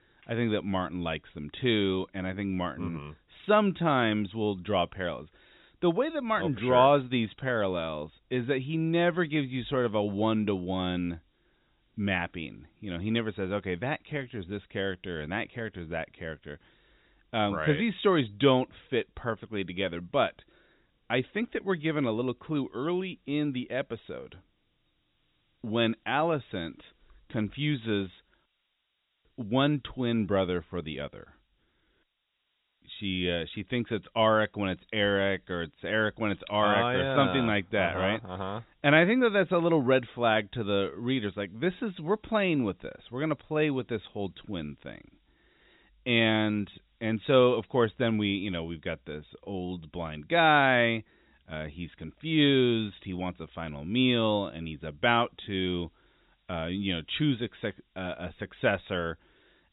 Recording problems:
high frequencies cut off; severe; nothing above 4 kHz
hiss; very faint; throughout; 45 dB below the speech

